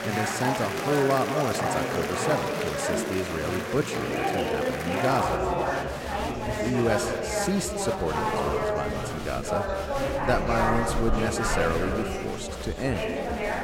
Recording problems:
echo of what is said; strong; throughout; 170 ms later, 7 dB below the speech
chatter from many people; very loud; throughout; 1 dB above the speech

